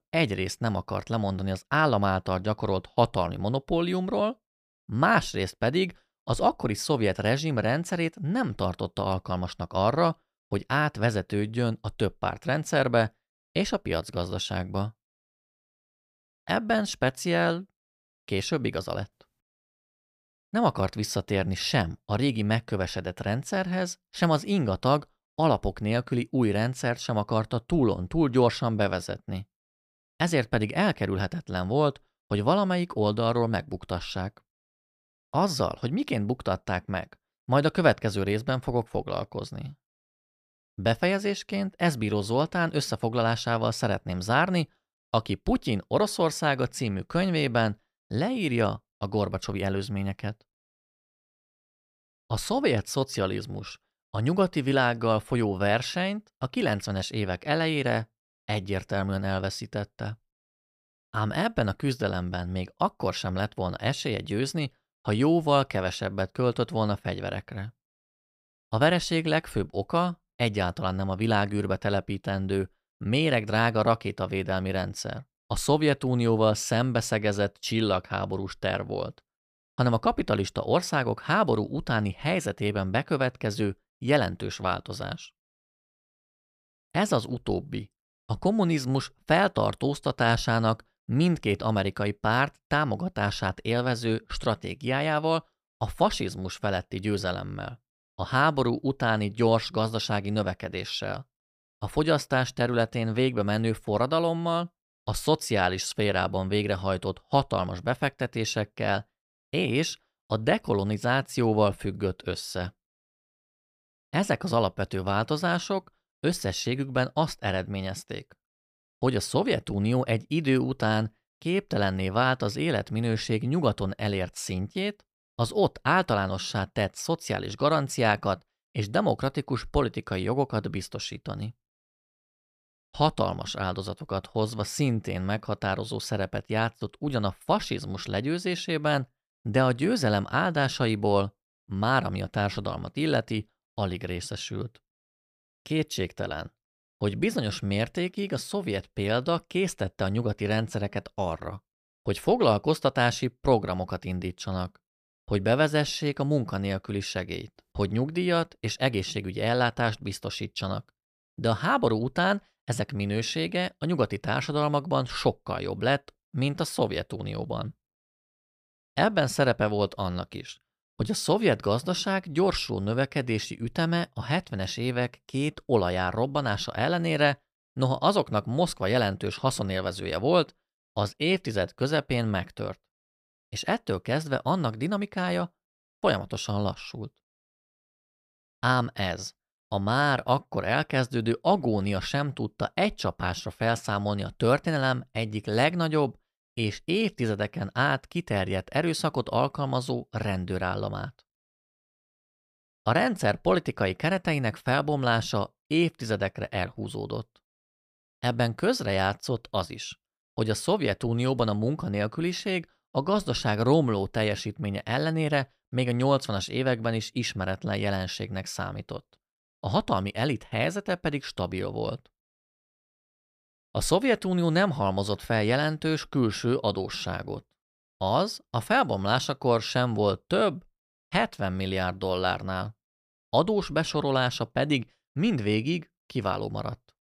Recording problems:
none

